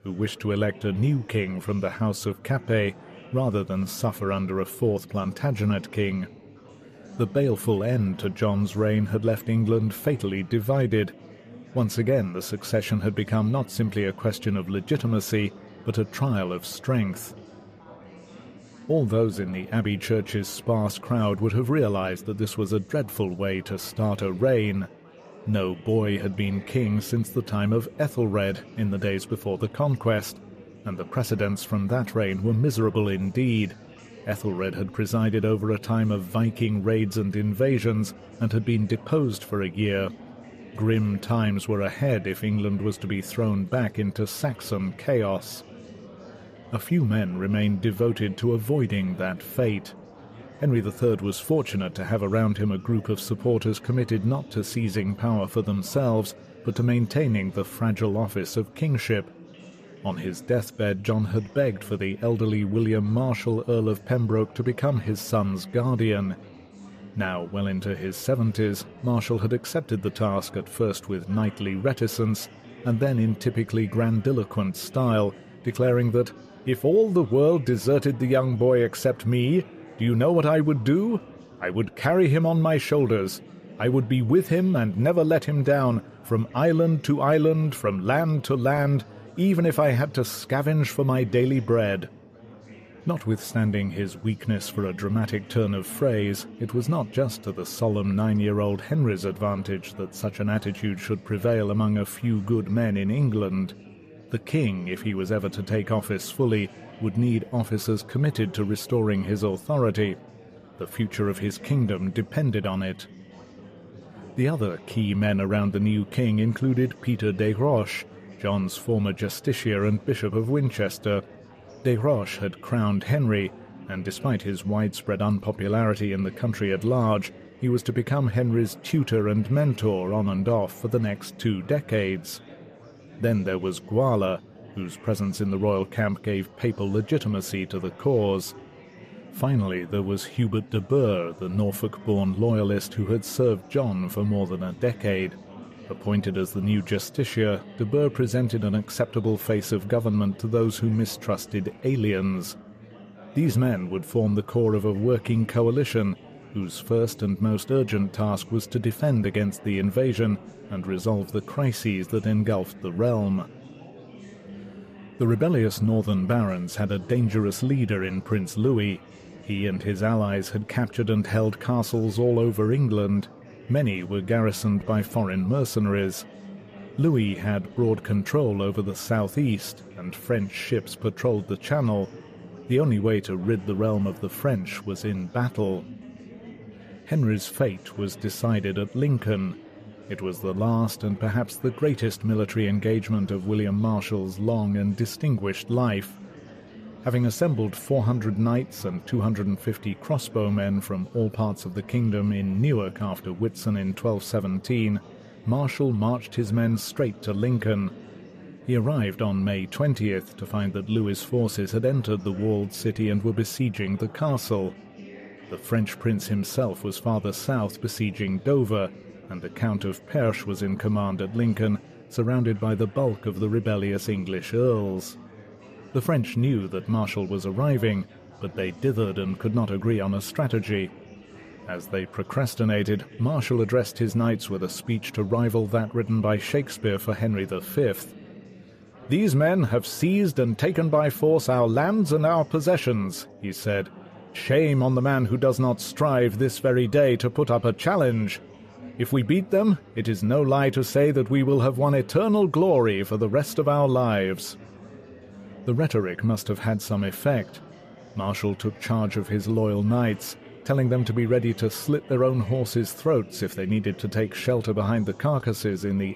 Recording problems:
chatter from many people; faint; throughout; 20 dB below the speech

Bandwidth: 14.5 kHz